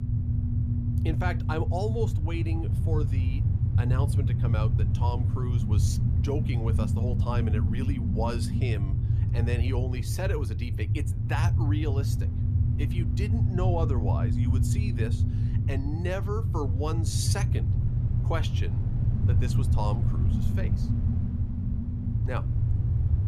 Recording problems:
low rumble; loud; throughout; 4 dB below the speech
electrical hum; noticeable; throughout; 50 Hz, 20 dB below the speech

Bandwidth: 14.5 kHz